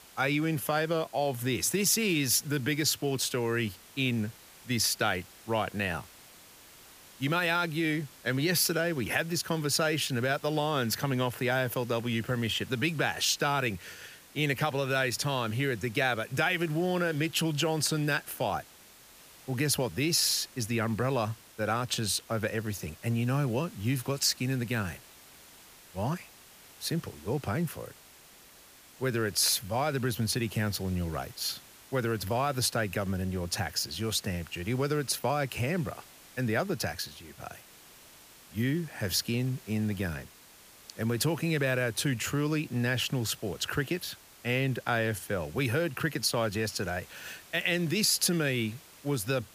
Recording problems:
hiss; faint; throughout; 20 dB below the speech

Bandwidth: 15 kHz